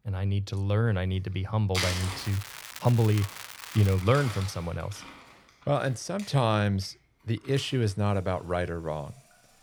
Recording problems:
household noises; loud; throughout; 10 dB below the speech
crackling; noticeable; from 2 to 4 s; 15 dB below the speech

